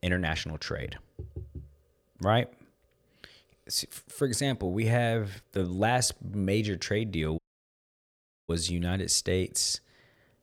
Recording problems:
audio cutting out; at 7.5 s for 1 s

